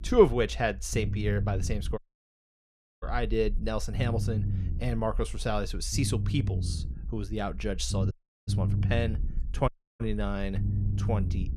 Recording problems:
low rumble; noticeable; throughout; 15 dB below the speech
audio cutting out; at 2 s for 1 s, at 8 s and at 9.5 s

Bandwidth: 15 kHz